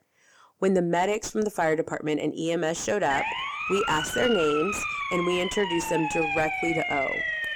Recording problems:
distortion; slight; 10 dB below the speech
siren; noticeable; from 3 s on; peak level with the speech

